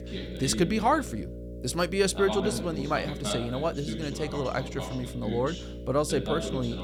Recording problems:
voice in the background; loud; throughout; 7 dB below the speech
electrical hum; noticeable; throughout; 60 Hz, 15 dB below the speech

